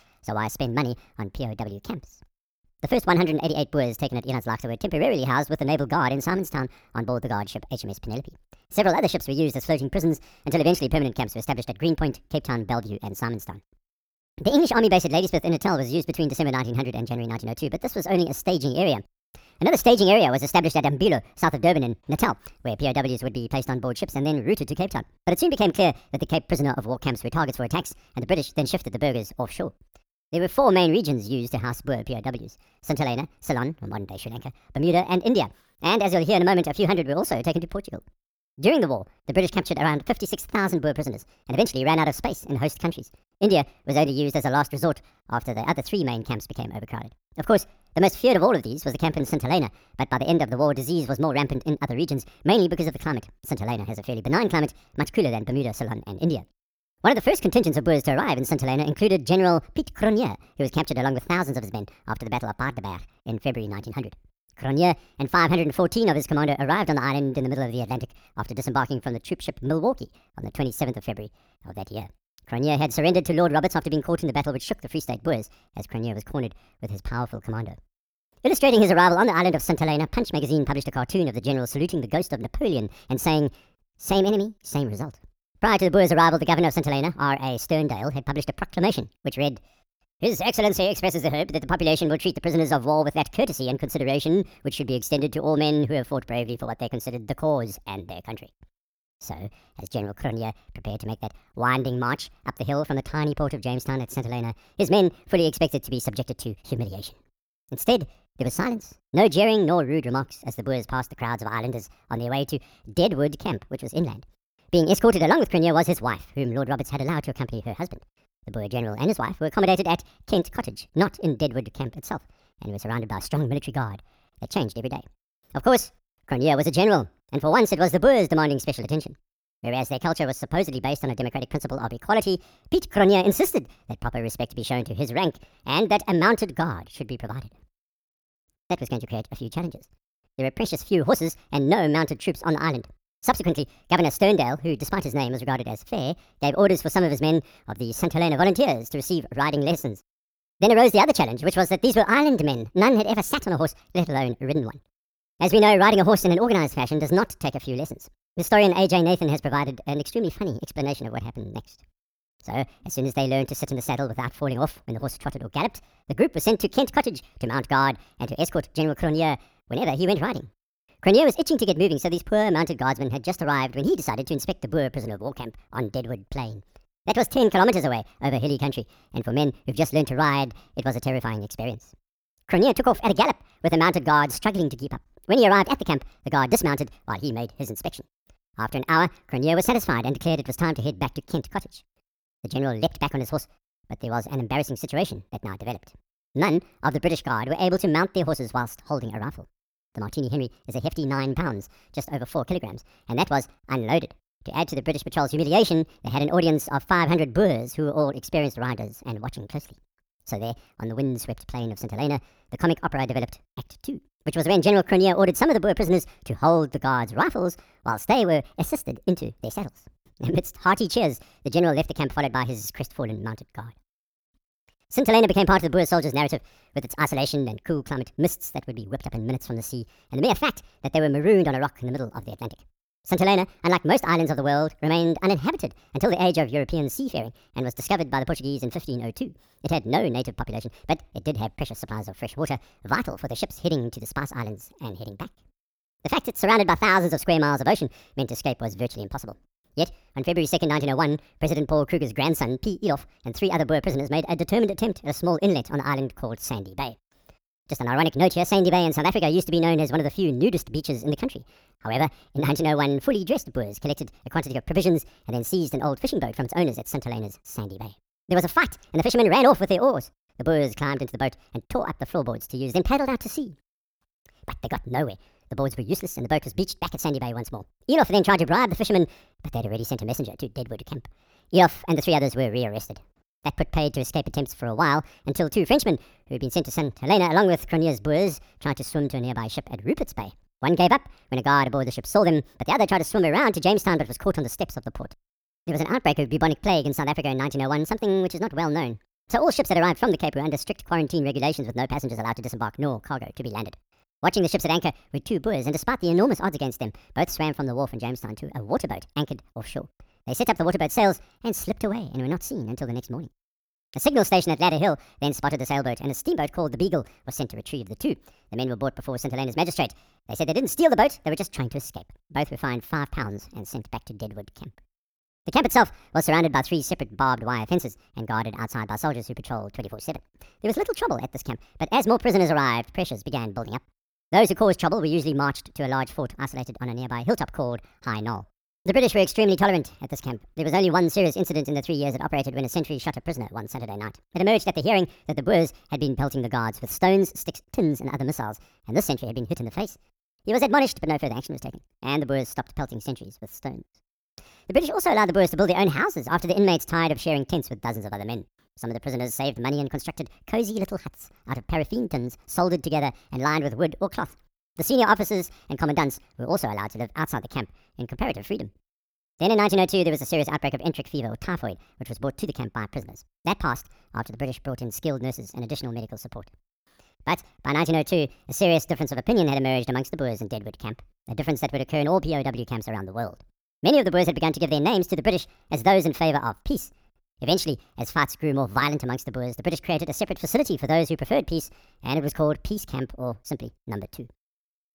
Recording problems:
wrong speed and pitch; too fast and too high; 1.5 times normal speed

